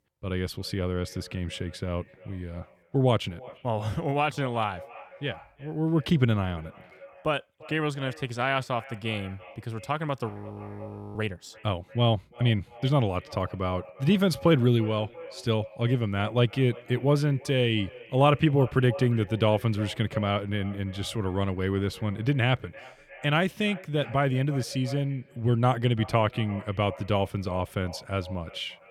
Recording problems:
echo of what is said; faint; throughout; 340 ms later, 20 dB below the speech
audio freezing; at 10 s for 1 s

